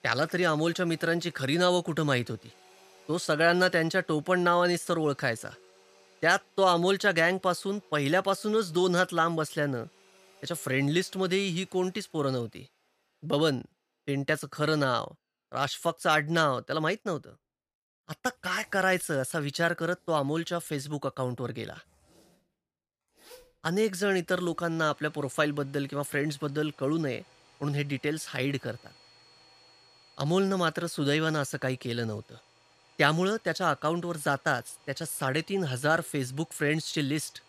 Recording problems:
household noises; faint; throughout; 30 dB below the speech

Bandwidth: 15 kHz